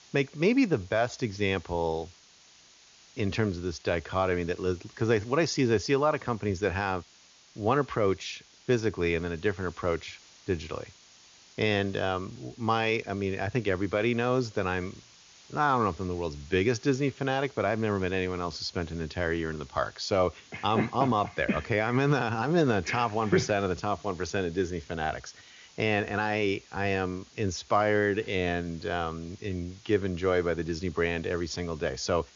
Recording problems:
high frequencies cut off; noticeable; nothing above 7 kHz
hiss; faint; throughout; 25 dB below the speech

